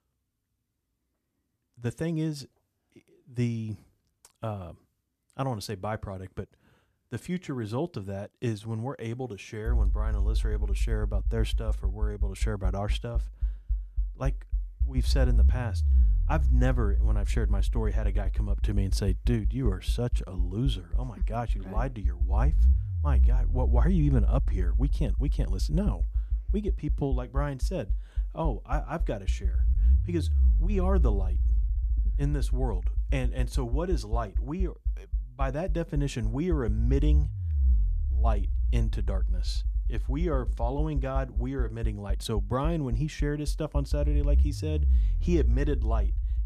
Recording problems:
low rumble; noticeable; from 9.5 s on; 15 dB below the speech

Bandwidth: 14 kHz